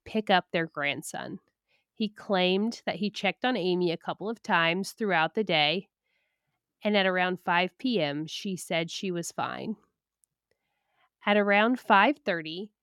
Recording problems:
none

